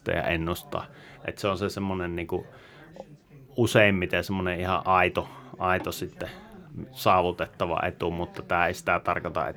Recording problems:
background chatter; faint; throughout; 2 voices, 25 dB below the speech

